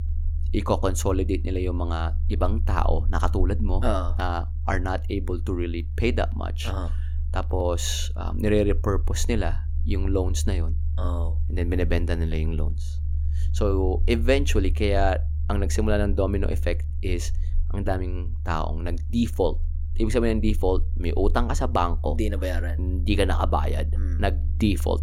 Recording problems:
low rumble; noticeable; throughout; 20 dB below the speech

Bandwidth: 16 kHz